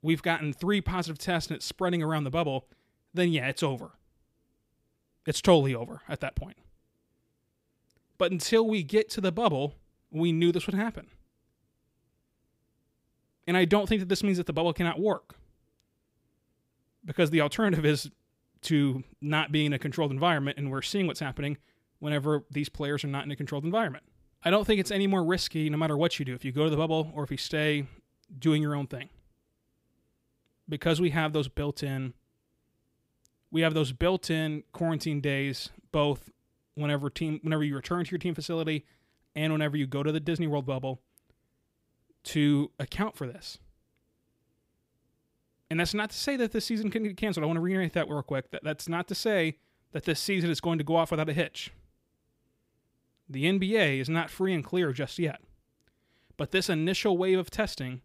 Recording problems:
none

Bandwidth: 15.5 kHz